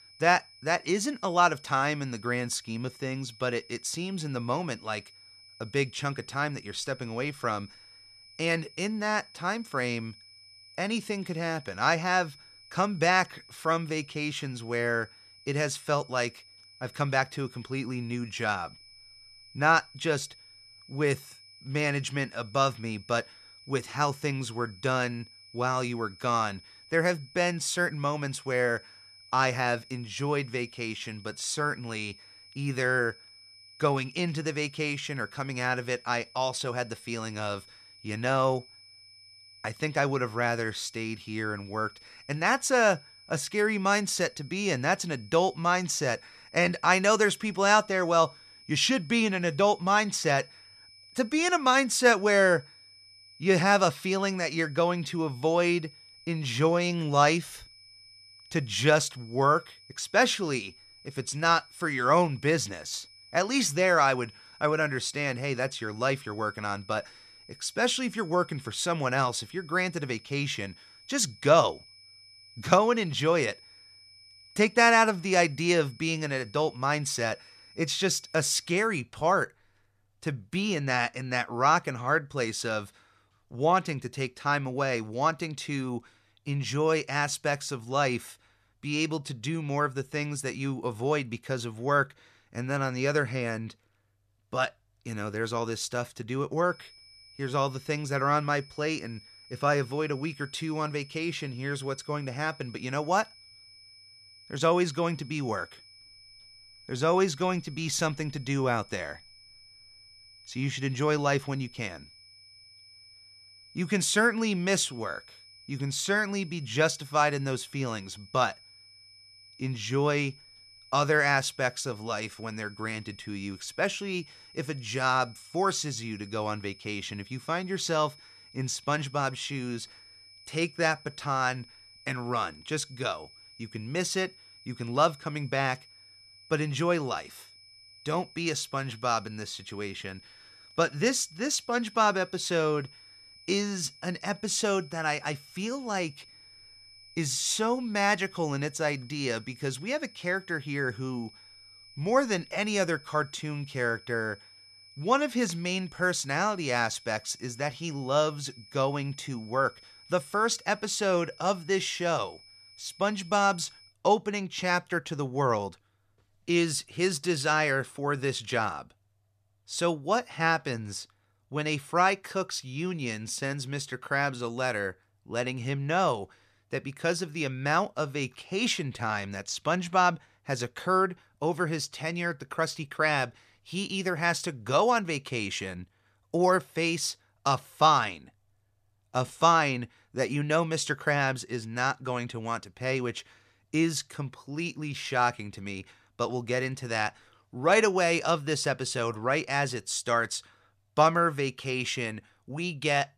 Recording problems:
high-pitched whine; faint; until 1:19 and from 1:37 to 2:44; 5 kHz, 20 dB below the speech

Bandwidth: 14 kHz